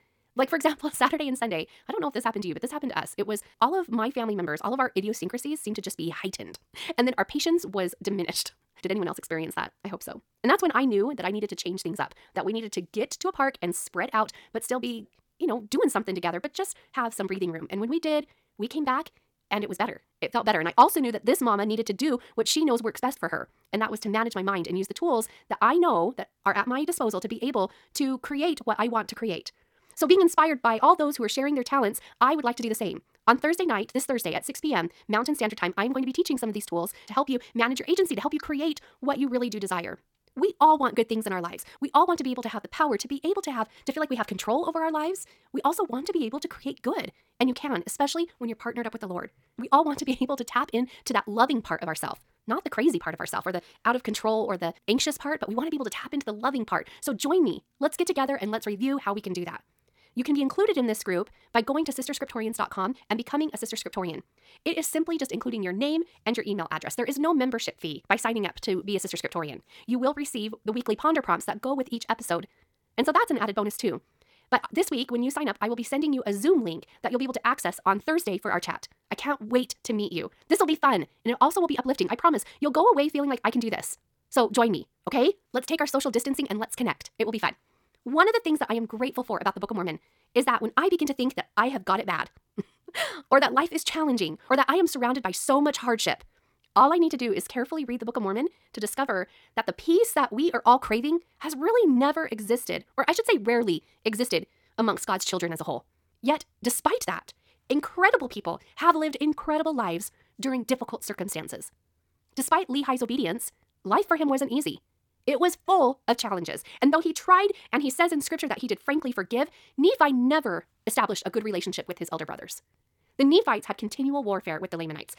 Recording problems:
wrong speed, natural pitch; too fast; 1.7 times normal speed

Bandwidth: 18 kHz